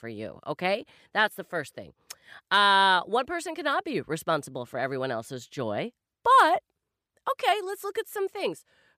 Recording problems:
none

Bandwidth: 15 kHz